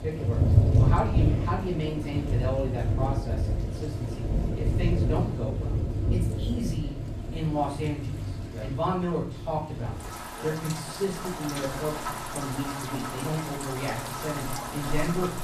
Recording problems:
off-mic speech; far
room echo; slight; dies away in 0.4 s
rain or running water; very loud; throughout; 3 dB above the speech

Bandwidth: 14.5 kHz